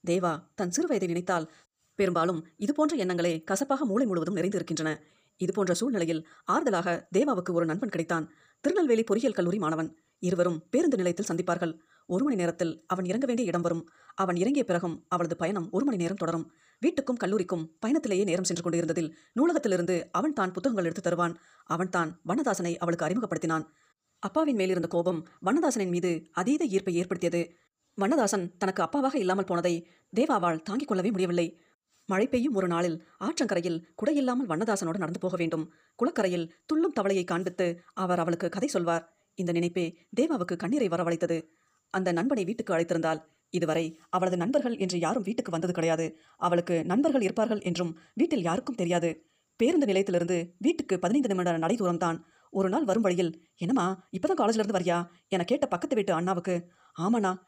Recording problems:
wrong speed, natural pitch; too fast; 1.6 times normal speed

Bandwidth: 15 kHz